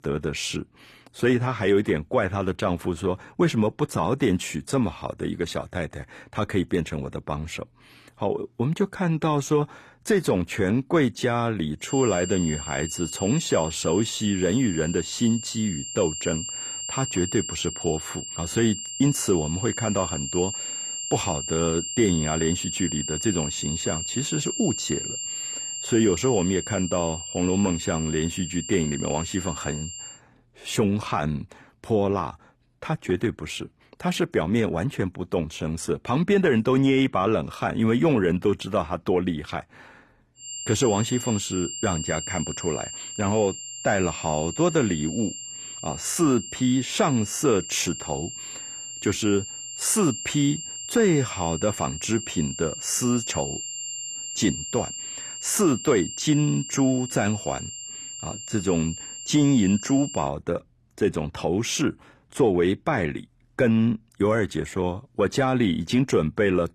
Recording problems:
high-pitched whine; loud; from 12 to 30 s and from 40 s to 1:00; 7.5 kHz, 7 dB below the speech

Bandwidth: 14.5 kHz